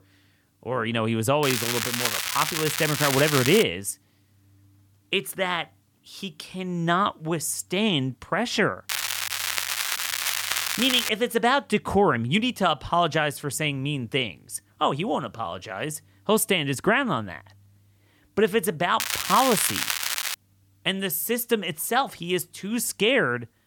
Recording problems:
crackling; loud; from 1.5 to 3.5 s, from 9 to 11 s and from 19 to 20 s; 1 dB below the speech

